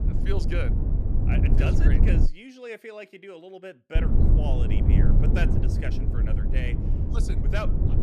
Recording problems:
low rumble; loud; until 2.5 s and from 4 s on; as loud as the speech

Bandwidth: 15 kHz